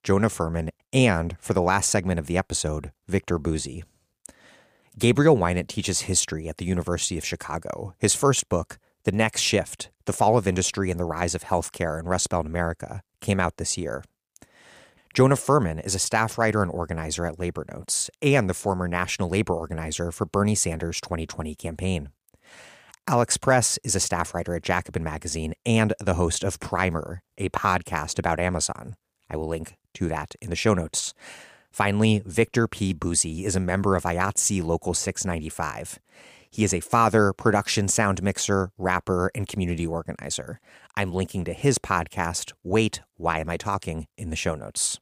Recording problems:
none

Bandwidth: 15 kHz